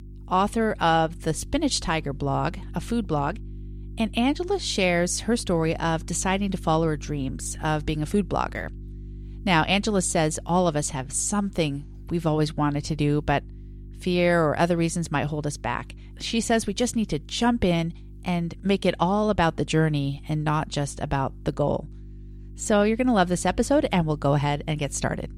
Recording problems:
electrical hum; faint; throughout; 50 Hz, 30 dB below the speech

